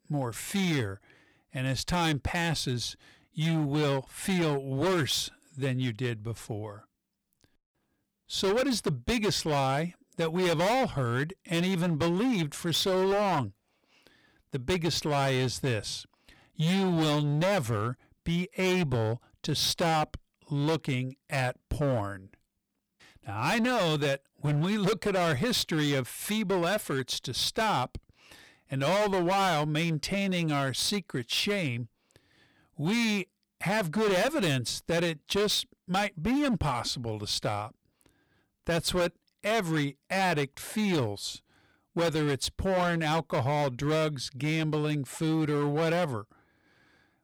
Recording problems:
distortion; heavy; 15% of the sound clipped

